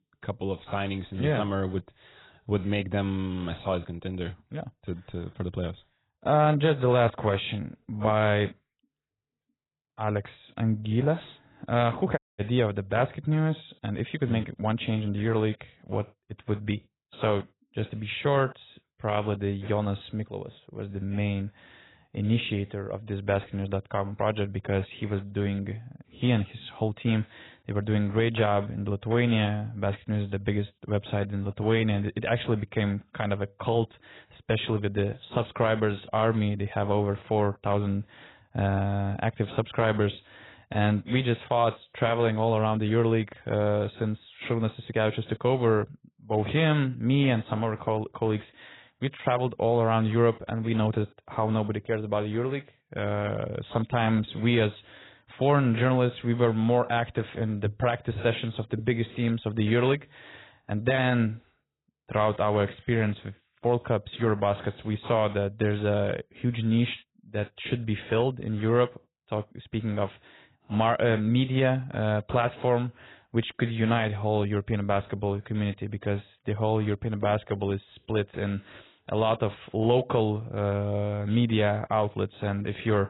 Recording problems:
garbled, watery; badly; nothing above 4 kHz
audio cutting out; at 12 s

